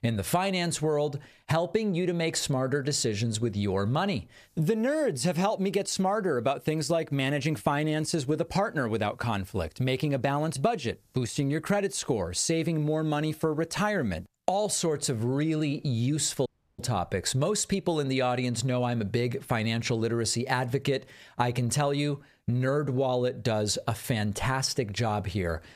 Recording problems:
squashed, flat; somewhat
audio cutting out; at 16 s

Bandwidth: 14.5 kHz